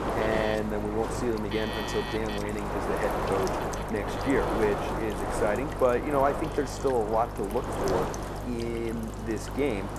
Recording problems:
wind noise on the microphone; heavy; 3 dB below the speech
electrical hum; noticeable; throughout; 50 Hz, 15 dB below the speech
alarms or sirens; noticeable; throughout; 10 dB below the speech
rain or running water; noticeable; throughout; 20 dB below the speech

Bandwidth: 13.5 kHz